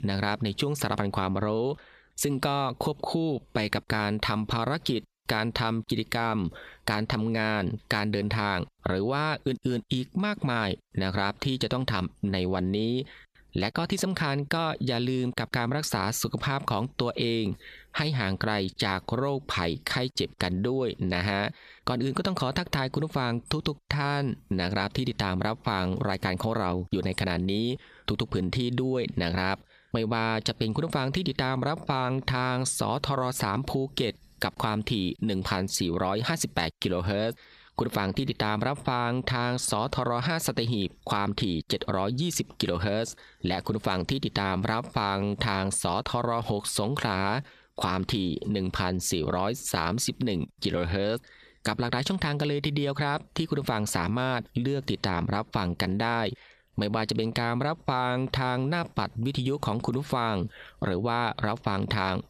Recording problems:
squashed, flat; somewhat

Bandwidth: 14 kHz